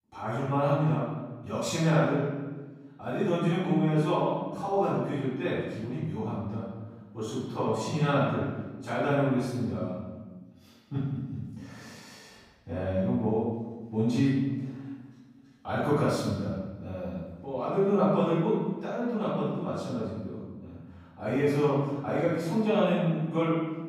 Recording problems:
room echo; strong; dies away in 1.2 s
off-mic speech; far

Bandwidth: 15.5 kHz